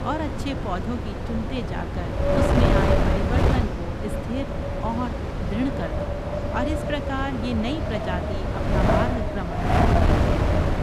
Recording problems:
wind noise on the microphone; heavy; 5 dB above the speech
background chatter; noticeable; throughout; 3 voices, 15 dB below the speech

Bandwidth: 14.5 kHz